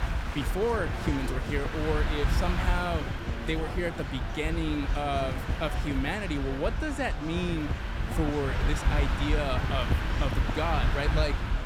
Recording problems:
wind noise on the microphone; heavy; 3 dB below the speech
chatter from many people; noticeable; throughout; 10 dB below the speech

